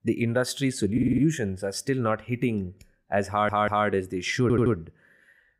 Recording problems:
audio stuttering; at 1 s, at 3.5 s and at 4.5 s

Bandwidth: 15.5 kHz